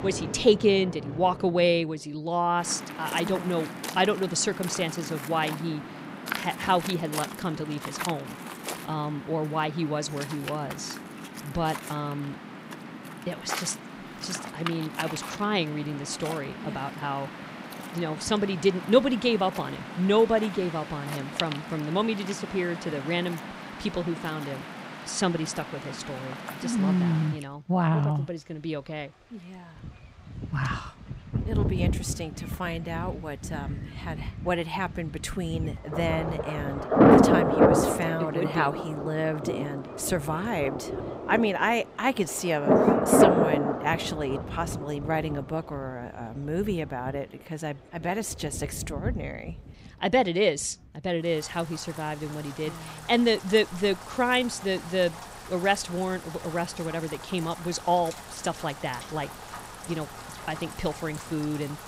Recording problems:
rain or running water; loud; throughout; 3 dB below the speech

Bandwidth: 15.5 kHz